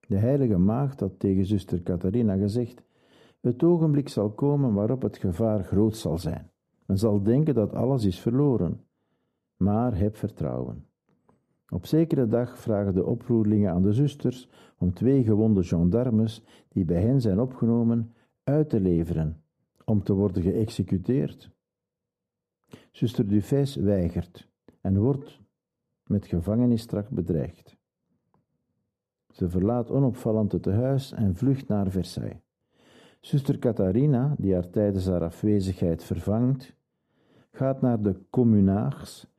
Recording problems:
muffled; very; fading above 1 kHz

